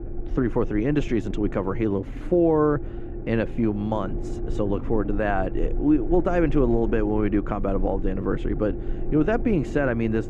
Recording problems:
muffled; very; fading above 2.5 kHz
low rumble; noticeable; throughout; 15 dB below the speech

